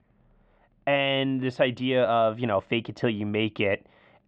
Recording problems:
muffled; very; fading above 3 kHz

